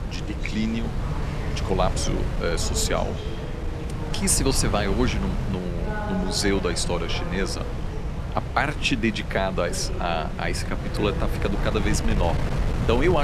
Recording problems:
wind noise on the microphone; heavy; 10 dB below the speech
background chatter; noticeable; throughout; 4 voices, 10 dB below the speech
abrupt cut into speech; at the end

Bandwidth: 13.5 kHz